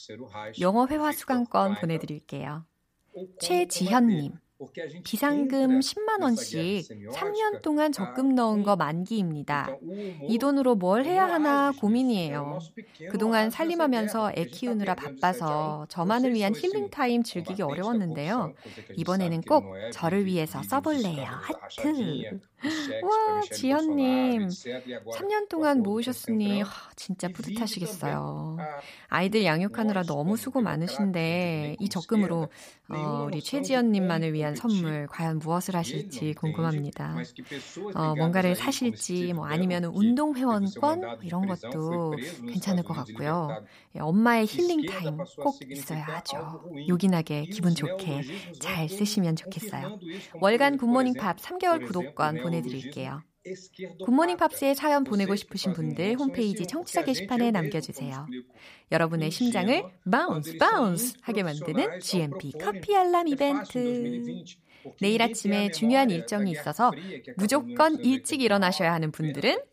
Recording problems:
voice in the background; noticeable; throughout; 15 dB below the speech

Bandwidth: 15 kHz